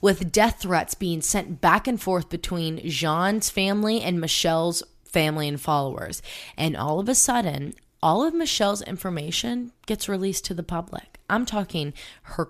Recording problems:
none

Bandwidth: 14.5 kHz